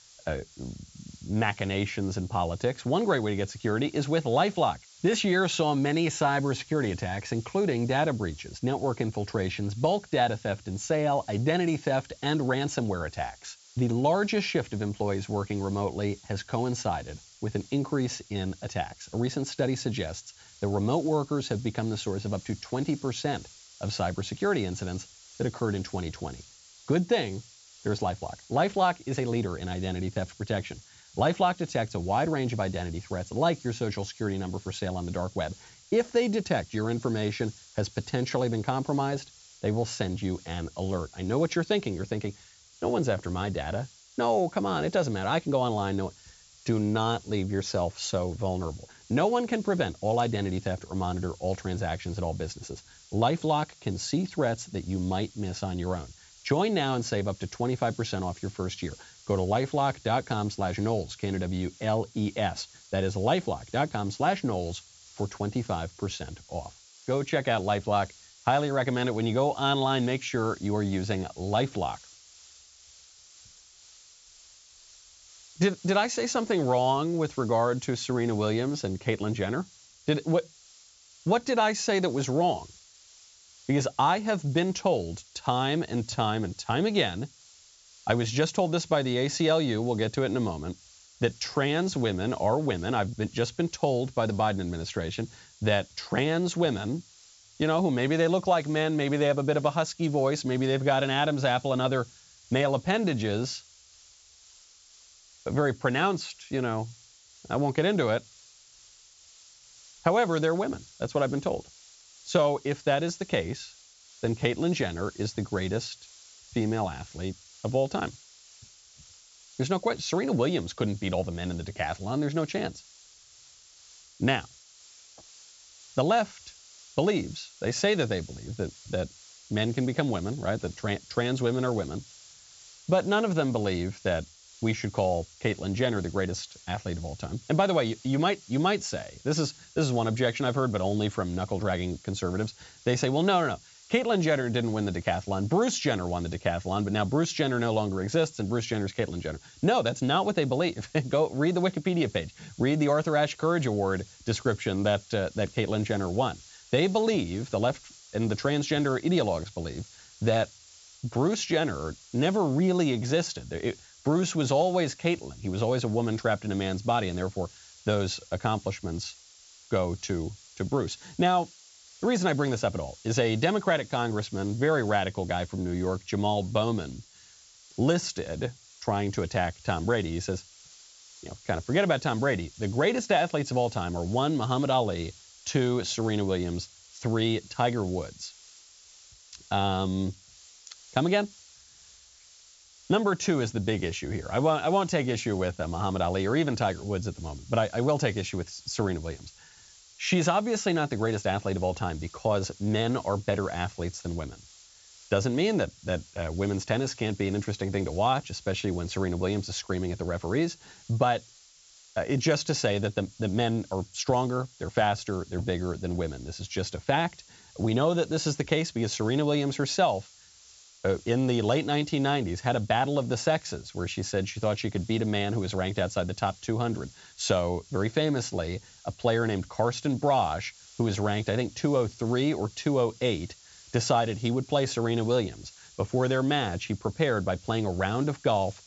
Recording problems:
high frequencies cut off; noticeable; nothing above 8 kHz
hiss; faint; throughout; 25 dB below the speech

